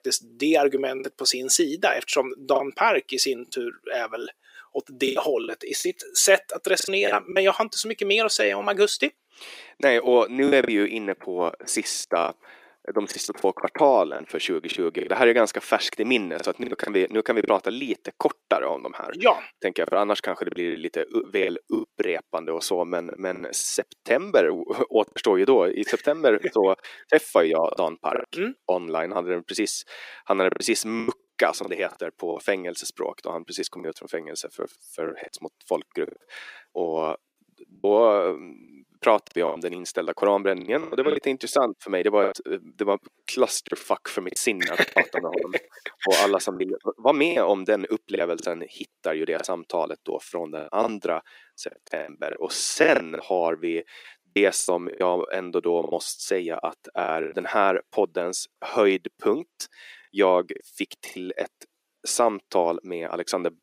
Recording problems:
thin; somewhat; fading below 350 Hz
choppy; very; 7% of the speech affected

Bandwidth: 15.5 kHz